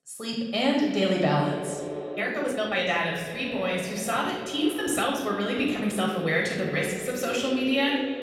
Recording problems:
echo of what is said; strong; throughout; 250 ms later, 10 dB below the speech
off-mic speech; far
room echo; noticeable; dies away in 0.9 s
uneven, jittery; strongly; from 2 to 6.5 s

